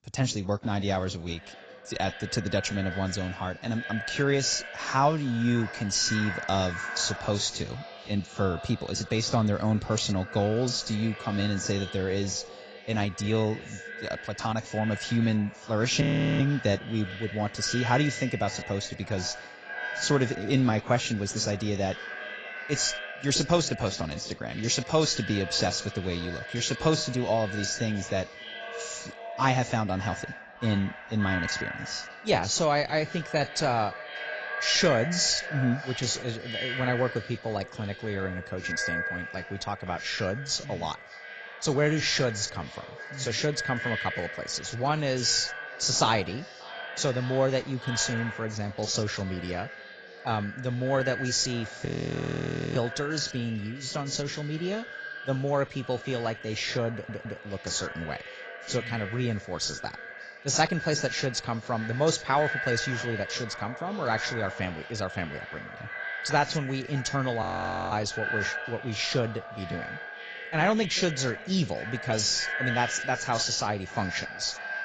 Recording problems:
echo of what is said; strong; throughout; 580 ms later, 9 dB below the speech
garbled, watery; badly; nothing above 7.5 kHz
audio freezing; at 16 s, at 52 s for 1 s and at 1:07
audio stuttering; at 57 s

